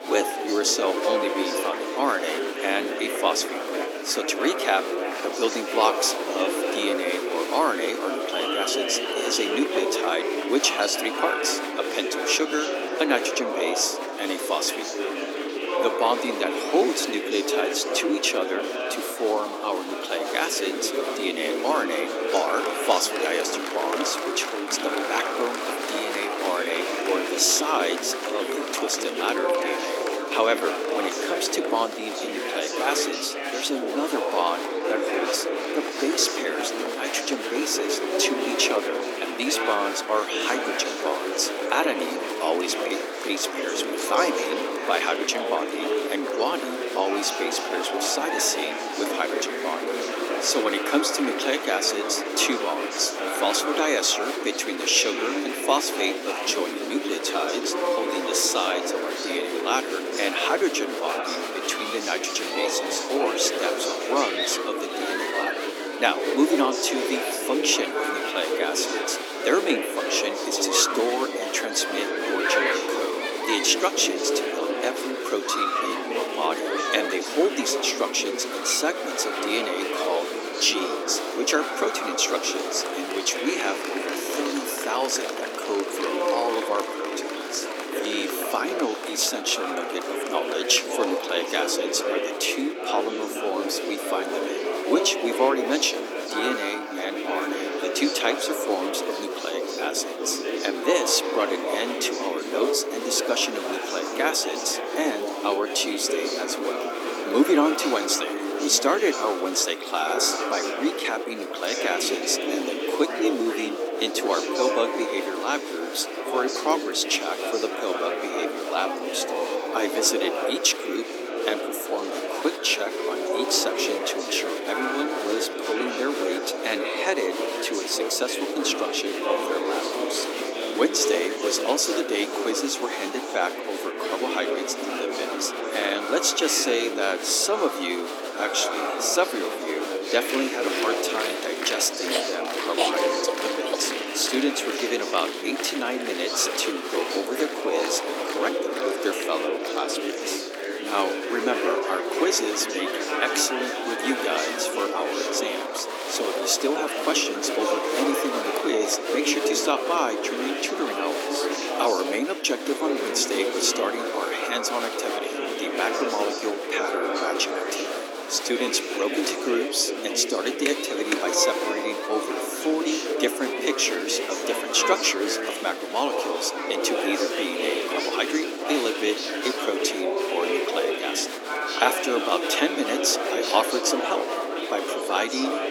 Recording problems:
thin; somewhat; fading below 300 Hz
murmuring crowd; loud; throughout; 2 dB below the speech

